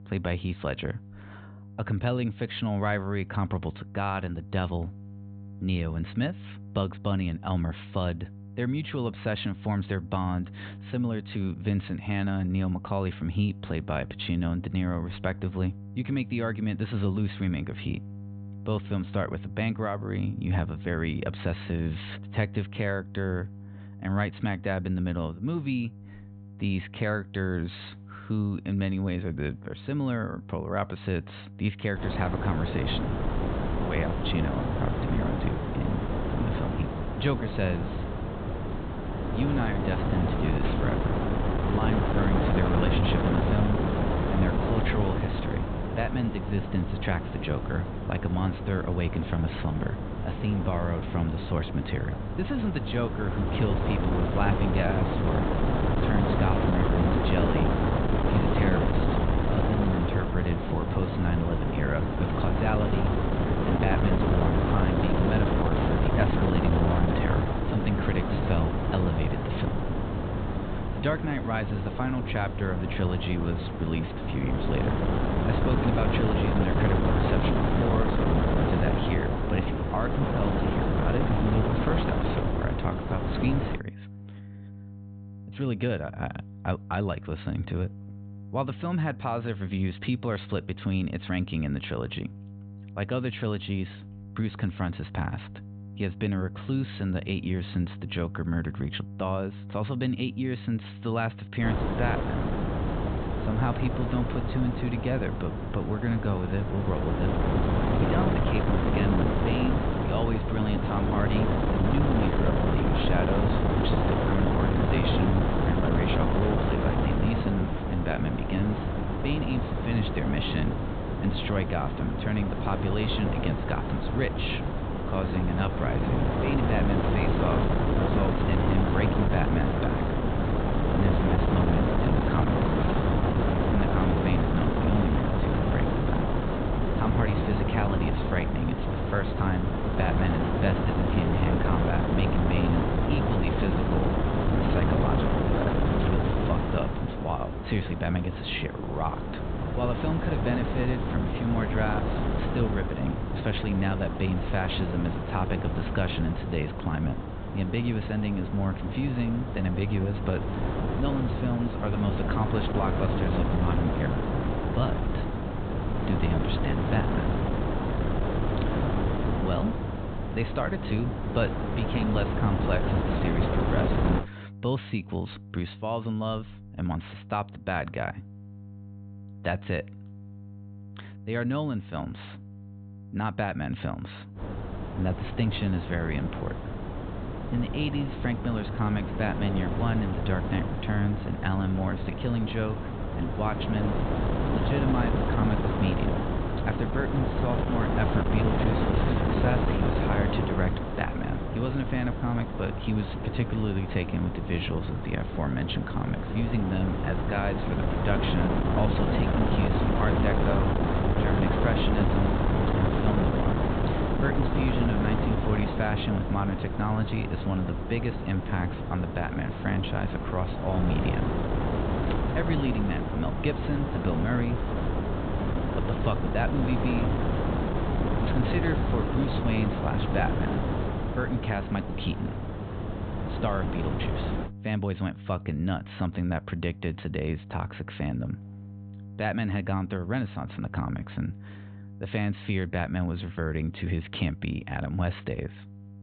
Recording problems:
high frequencies cut off; severe; nothing above 4 kHz
wind noise on the microphone; heavy; from 32 s to 1:24, from 1:42 to 2:54 and from 3:04 to 3:54; 2 dB above the speech
electrical hum; noticeable; throughout; 50 Hz, 20 dB below the speech

